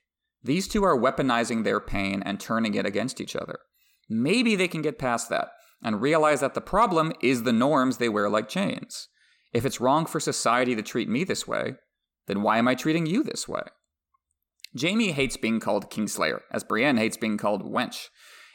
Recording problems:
none

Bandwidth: 17.5 kHz